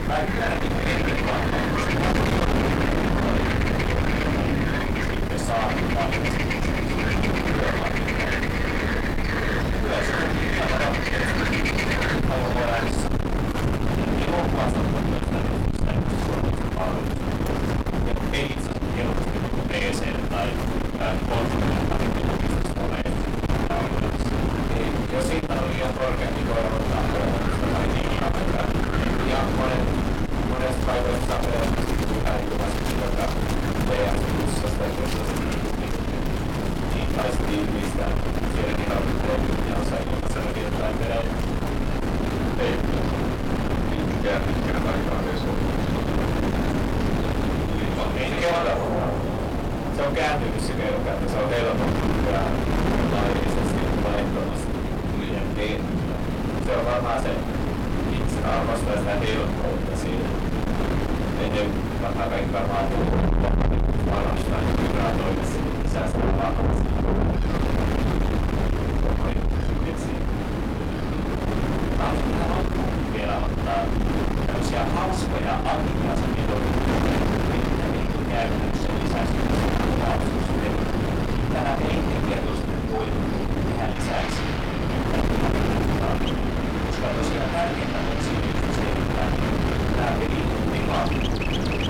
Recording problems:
distortion; heavy; 6 dB below the speech
off-mic speech; far
room echo; slight; dies away in 0.3 s
wind noise on the microphone; heavy; 1 dB below the speech
animal sounds; loud; throughout; 2 dB below the speech
rain or running water; loud; throughout; 3 dB below the speech

